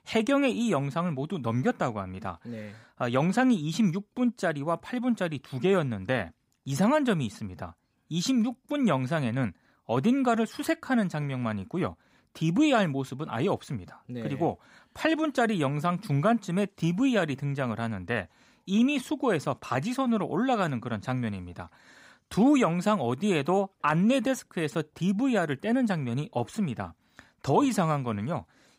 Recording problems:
none

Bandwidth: 15.5 kHz